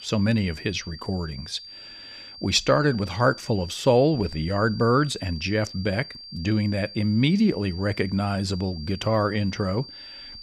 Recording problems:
high-pitched whine; noticeable; throughout; 4.5 kHz, 15 dB below the speech

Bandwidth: 15 kHz